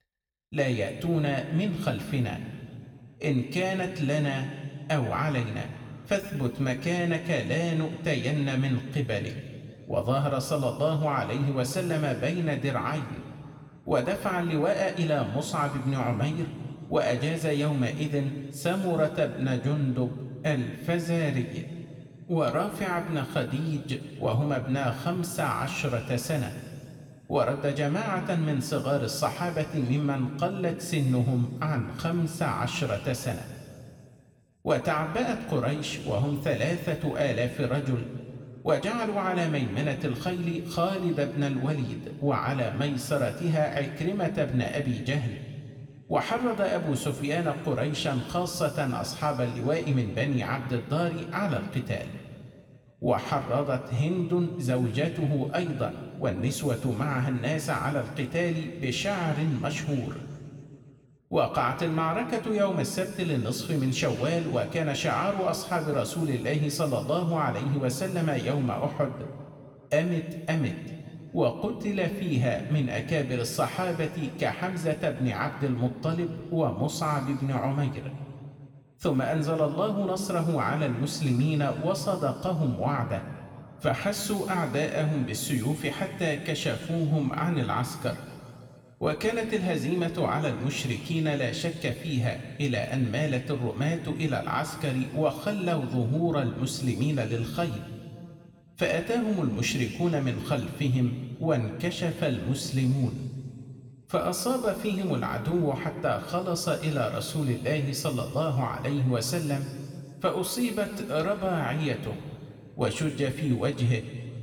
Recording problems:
room echo; noticeable; dies away in 2 s
off-mic speech; somewhat distant

